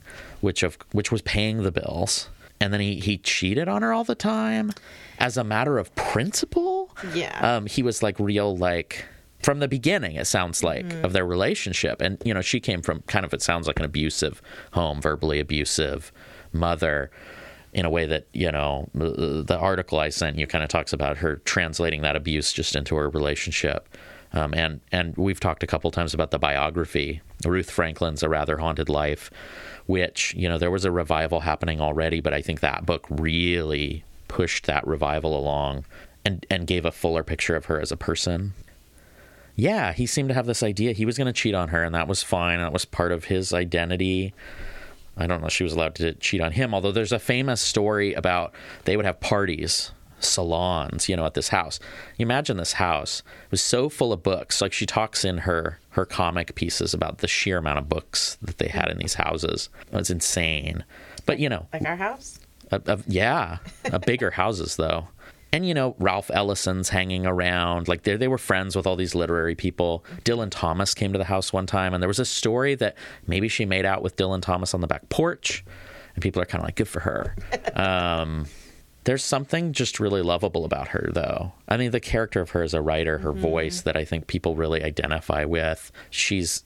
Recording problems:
squashed, flat; somewhat

